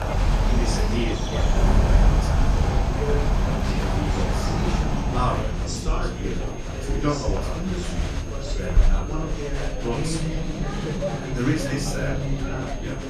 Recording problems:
off-mic speech; far
room echo; slight; dies away in 0.3 s
animal sounds; very loud; throughout; 5 dB above the speech
murmuring crowd; loud; throughout; 1 dB below the speech
high-pitched whine; noticeable; throughout; 6.5 kHz, 20 dB below the speech
electrical hum; faint; throughout; 50 Hz, 20 dB below the speech

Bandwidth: 14.5 kHz